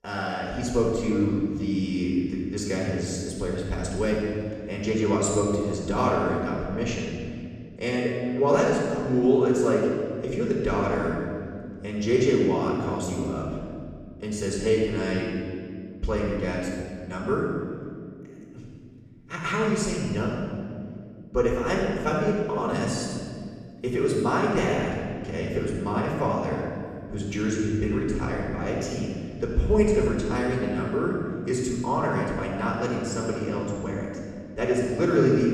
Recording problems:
off-mic speech; far
room echo; noticeable; dies away in 2 s

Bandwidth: 14.5 kHz